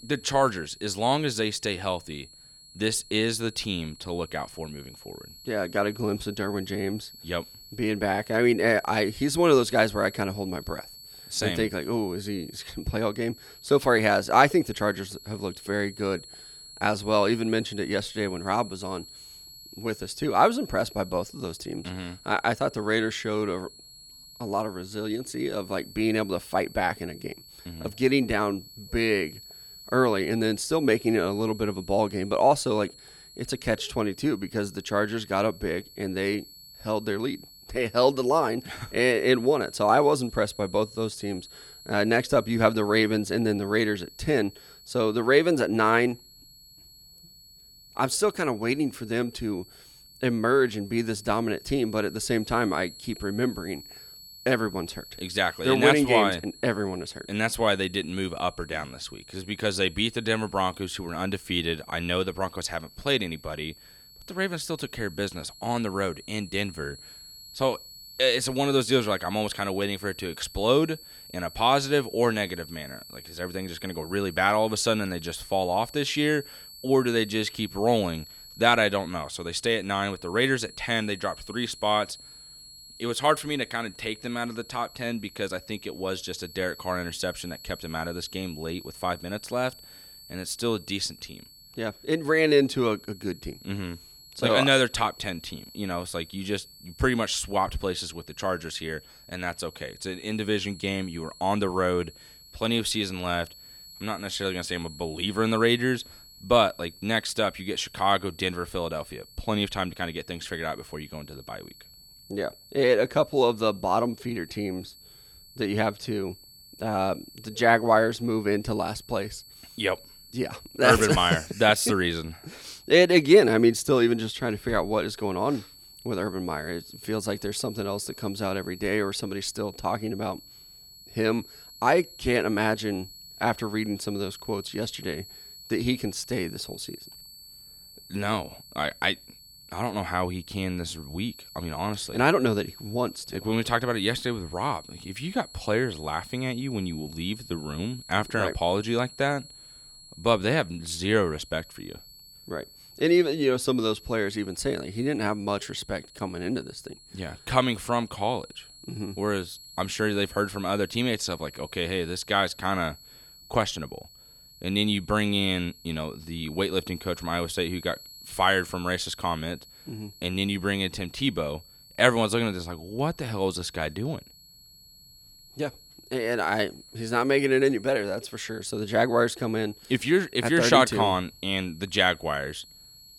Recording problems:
high-pitched whine; noticeable; throughout; 4.5 kHz, 20 dB below the speech

